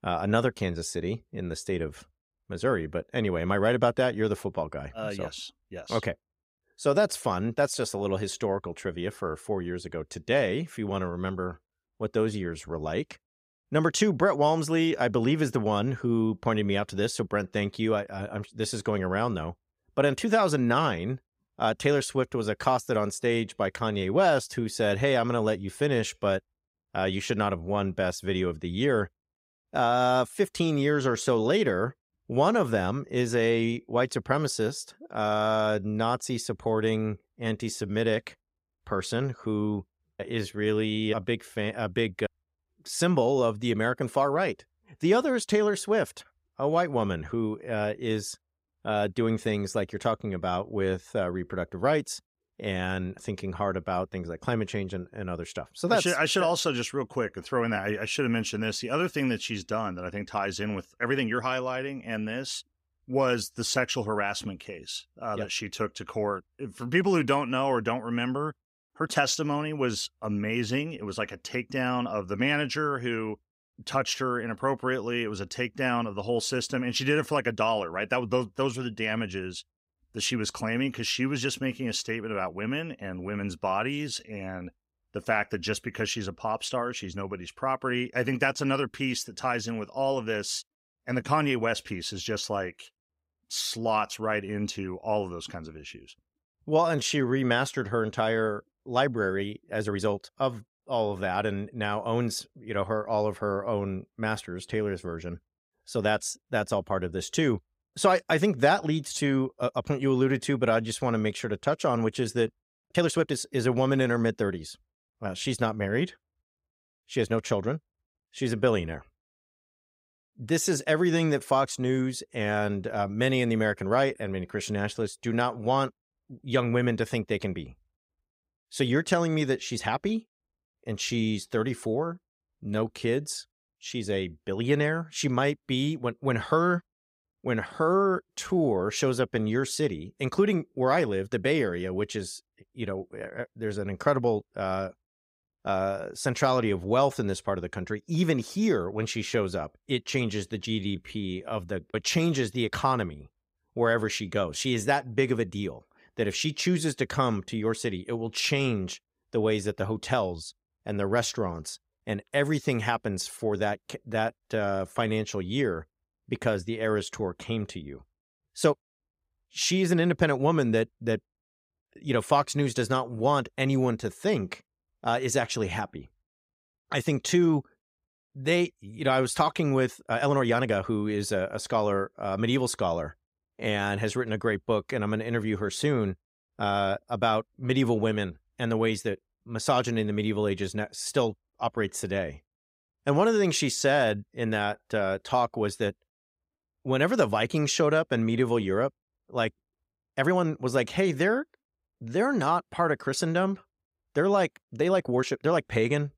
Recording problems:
uneven, jittery; strongly; from 40 s to 3:26

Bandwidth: 15.5 kHz